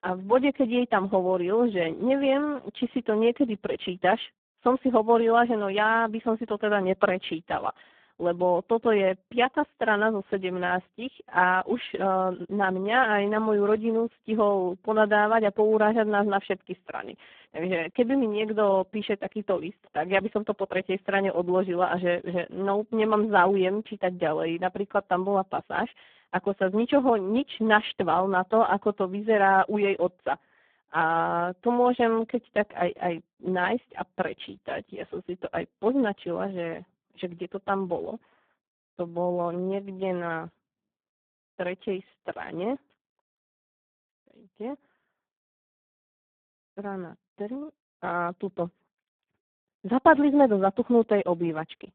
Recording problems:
phone-call audio; poor line

